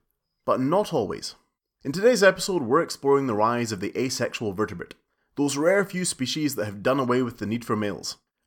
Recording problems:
none

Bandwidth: 17.5 kHz